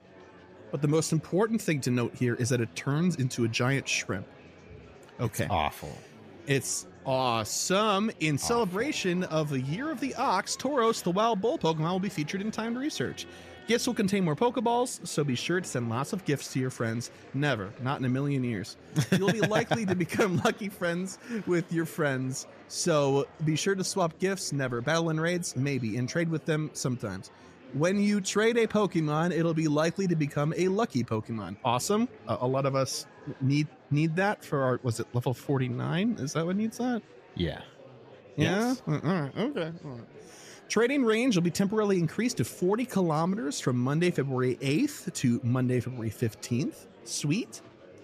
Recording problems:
murmuring crowd; faint; throughout; 20 dB below the speech

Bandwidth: 14.5 kHz